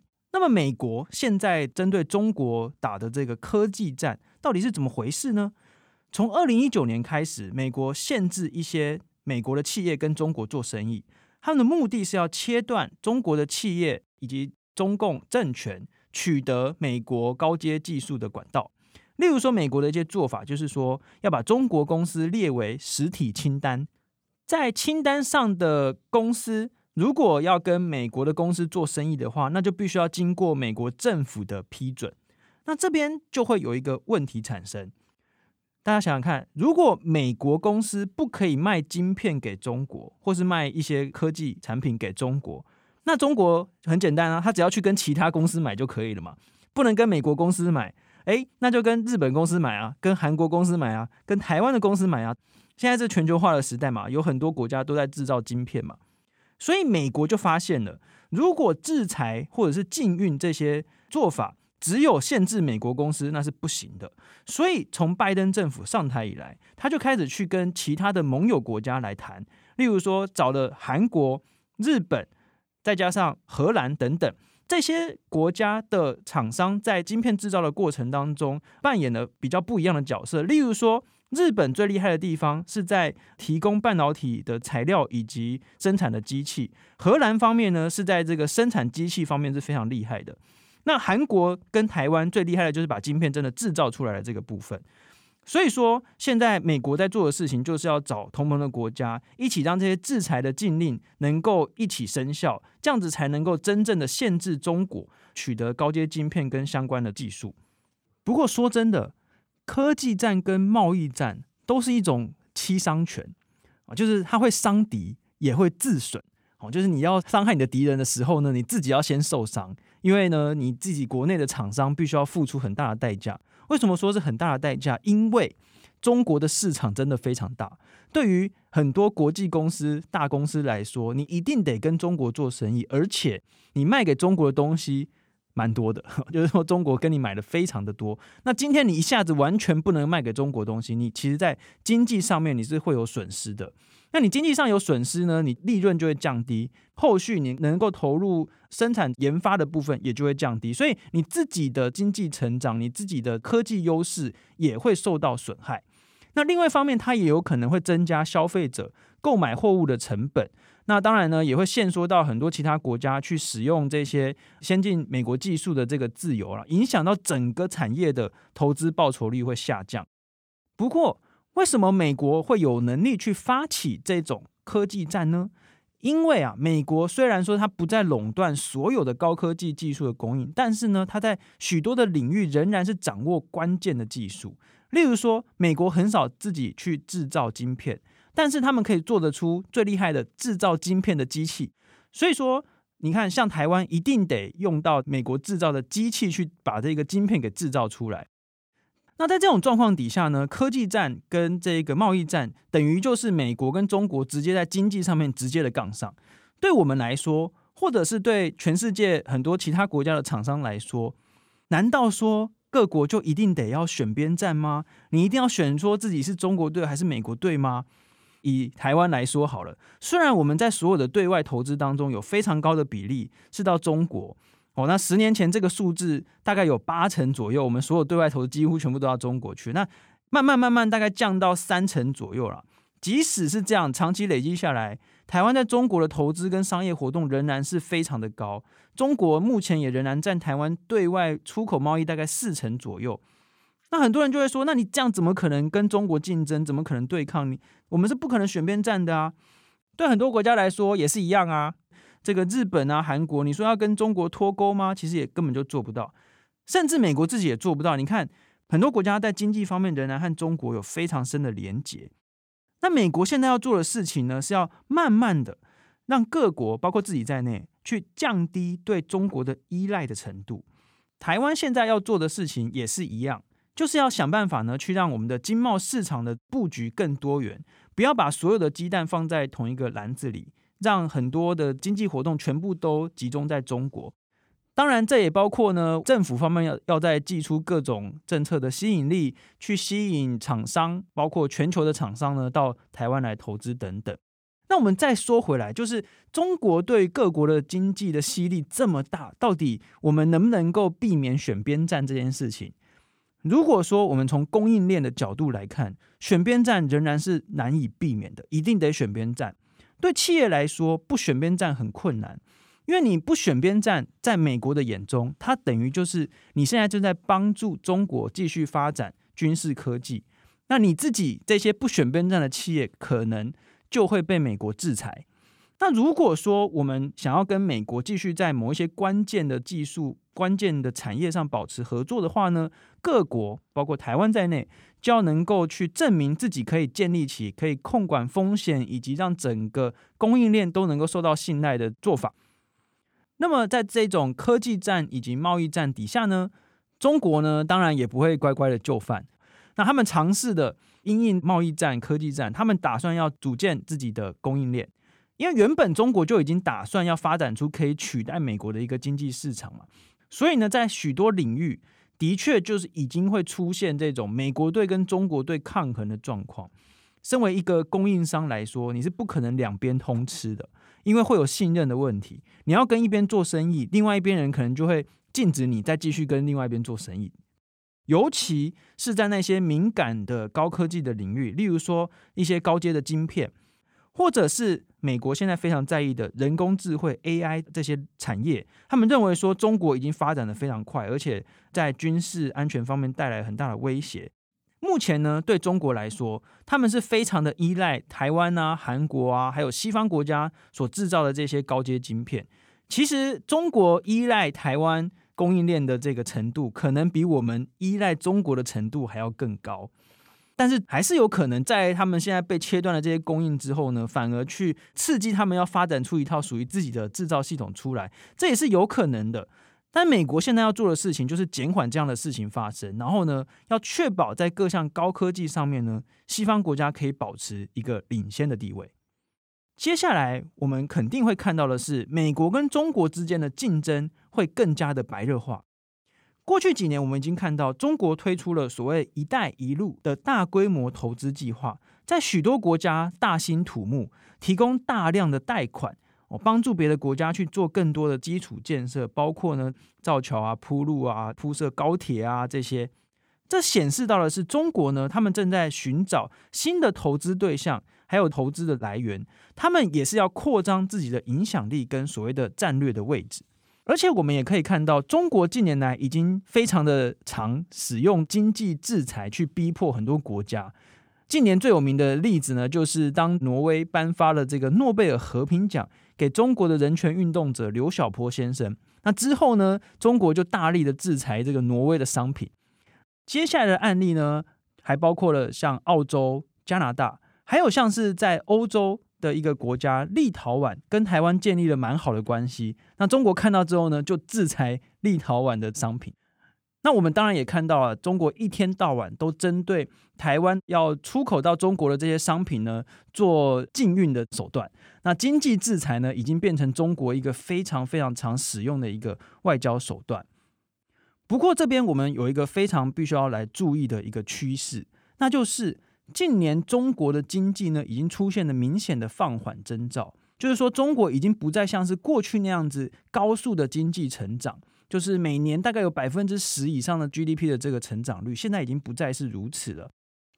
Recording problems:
none

